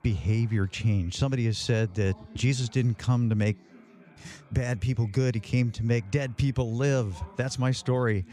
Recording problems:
background chatter; faint; throughout; 4 voices, 25 dB below the speech

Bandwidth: 15 kHz